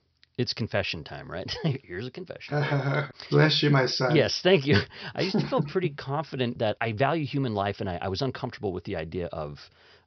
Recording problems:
high frequencies cut off; noticeable; nothing above 5.5 kHz

